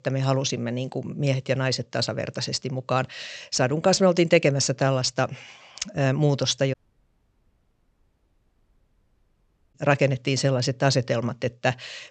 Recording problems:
high frequencies cut off; noticeable; nothing above 8 kHz
audio cutting out; at 6.5 s for 3 s

